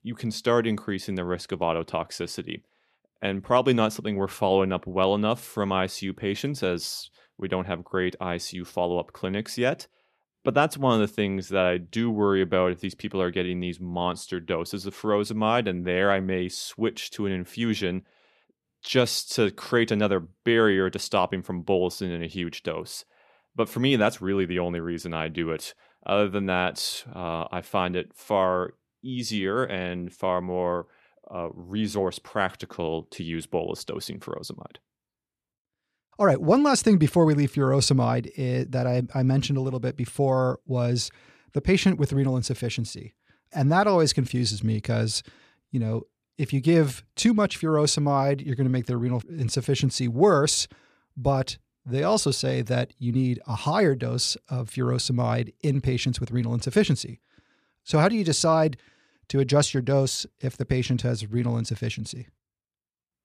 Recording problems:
none

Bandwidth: 14 kHz